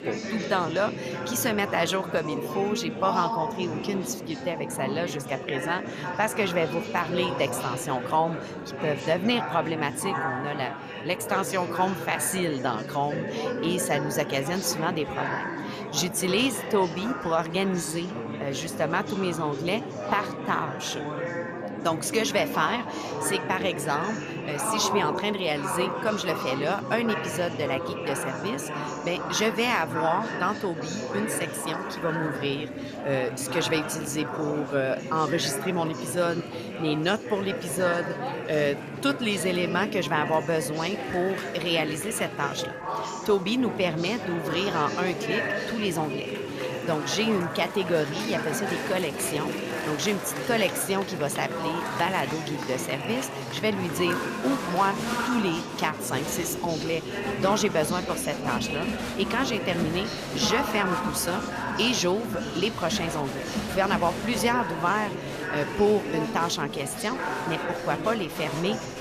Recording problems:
murmuring crowd; loud; throughout; 4 dB below the speech

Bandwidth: 14.5 kHz